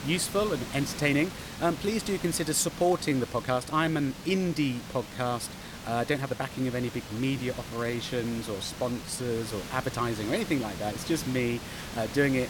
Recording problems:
hiss; noticeable; throughout; 10 dB below the speech
uneven, jittery; strongly; from 1 to 10 s

